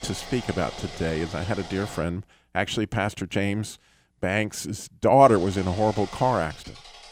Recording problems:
machinery noise; noticeable; throughout; 15 dB below the speech

